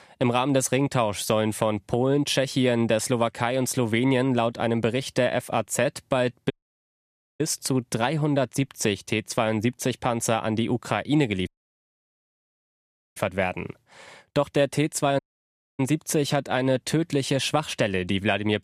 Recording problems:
audio cutting out; at 6.5 s for 1 s, at 11 s for 1.5 s and at 15 s for 0.5 s

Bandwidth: 14.5 kHz